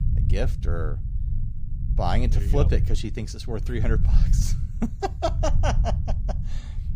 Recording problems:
low rumble; noticeable; throughout; 10 dB below the speech

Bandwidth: 15 kHz